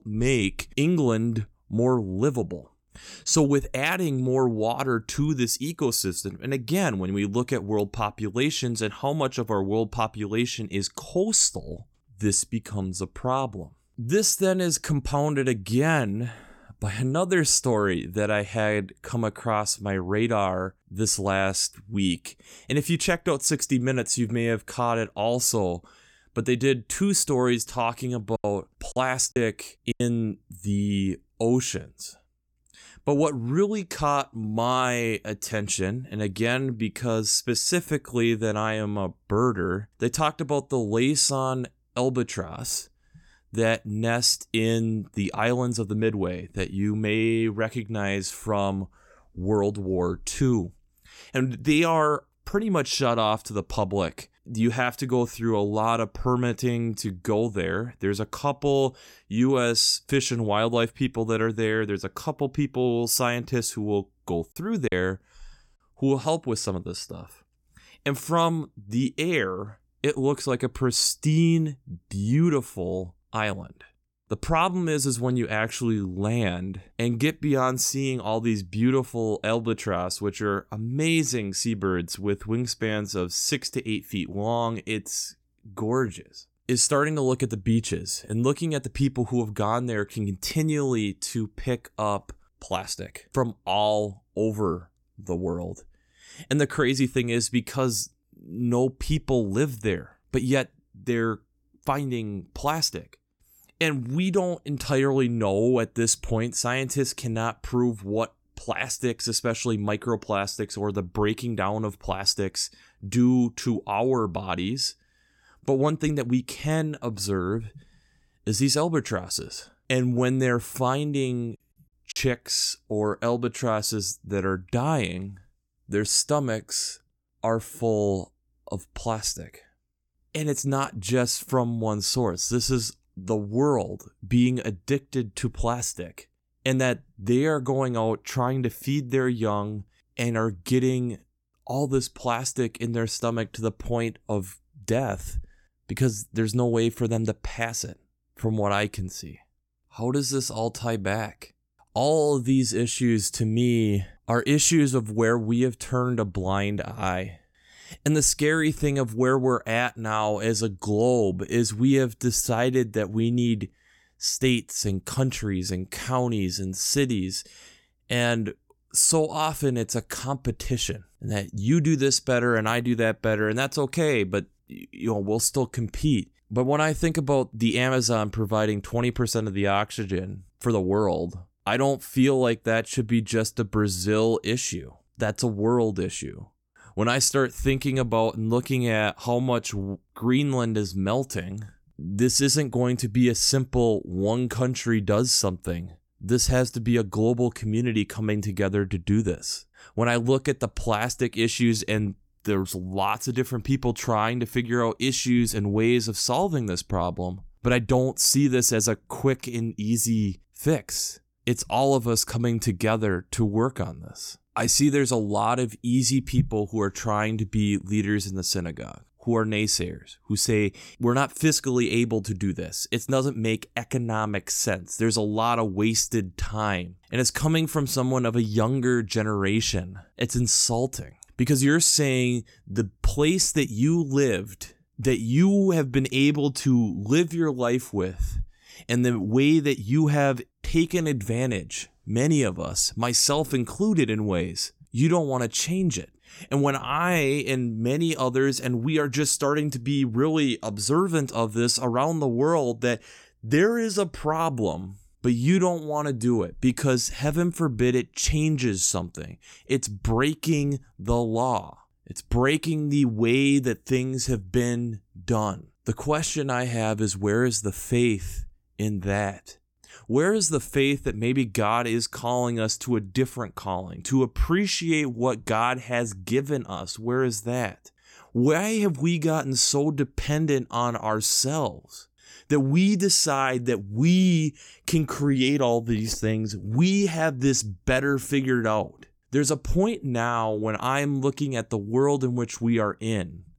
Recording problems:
choppy; very; from 28 to 30 s, at 1:05 and at 2:02; 9% of the speech affected

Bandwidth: 17.5 kHz